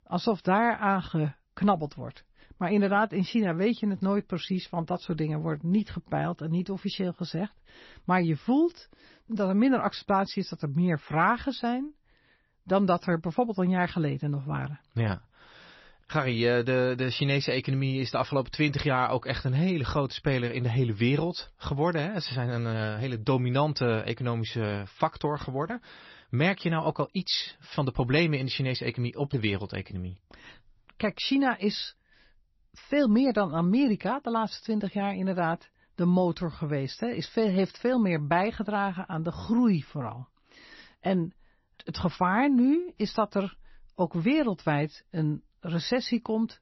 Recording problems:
garbled, watery; slightly; nothing above 5.5 kHz

